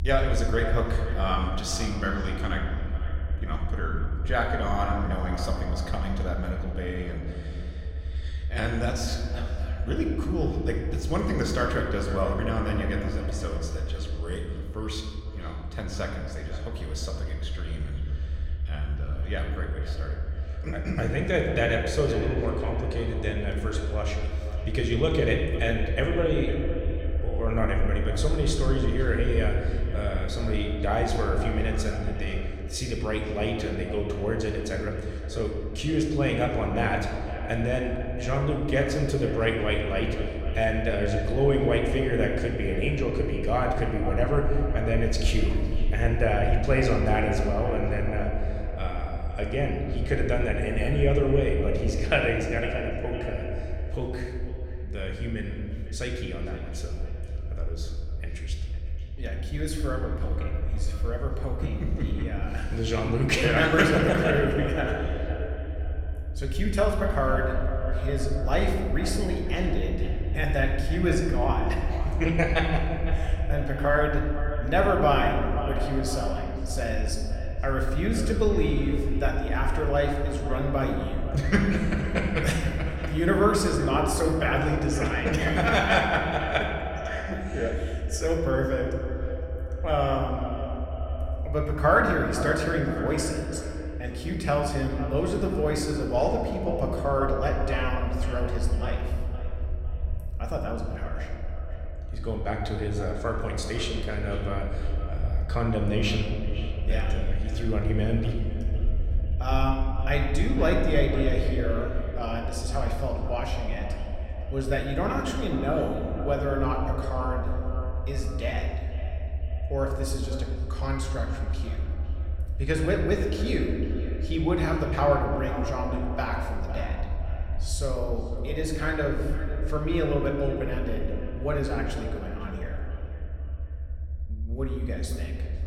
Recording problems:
echo of what is said; strong; throughout; 500 ms later, 10 dB below the speech
room echo; noticeable; dies away in 1.5 s
off-mic speech; somewhat distant
low rumble; faint; throughout; 20 dB below the speech

